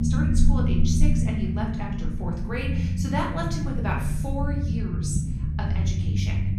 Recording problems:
off-mic speech; far
room echo; noticeable; dies away in 0.7 s
background music; loud; throughout; 1 dB below the speech
low rumble; loud; throughout; 5 dB below the speech

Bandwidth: 14.5 kHz